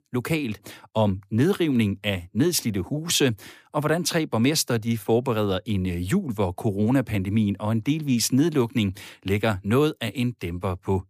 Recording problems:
none

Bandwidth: 15 kHz